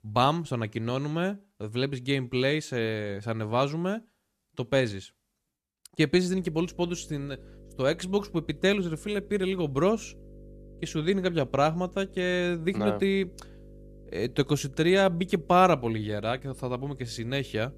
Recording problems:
electrical hum; faint; from 6.5 s on; 50 Hz, 30 dB below the speech

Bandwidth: 14 kHz